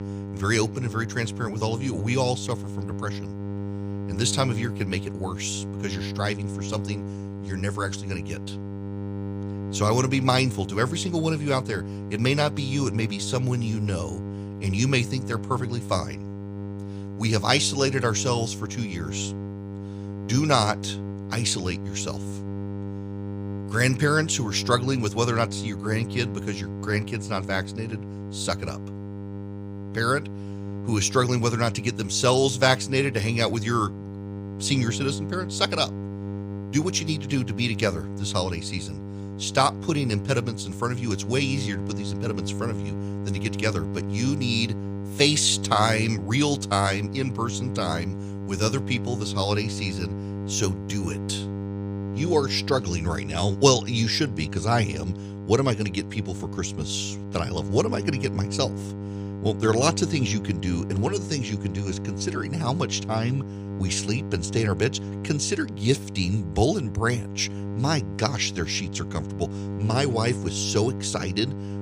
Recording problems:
electrical hum; noticeable; throughout; 50 Hz, 15 dB below the speech

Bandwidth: 15 kHz